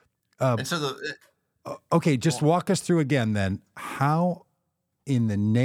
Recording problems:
abrupt cut into speech; at the end

